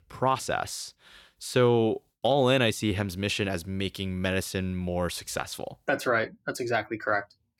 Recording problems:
none

